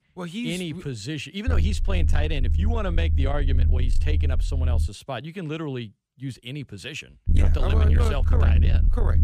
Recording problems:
distortion; slight; 10 dB below the speech
low rumble; loud; from 1.5 to 5 s and from 7.5 s on; 7 dB below the speech

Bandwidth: 15 kHz